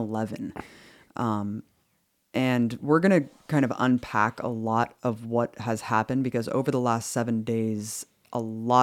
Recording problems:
abrupt cut into speech; at the start and the end

